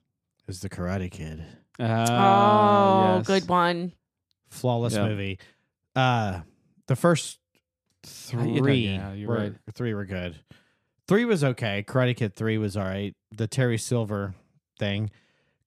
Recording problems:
none

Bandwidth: 14.5 kHz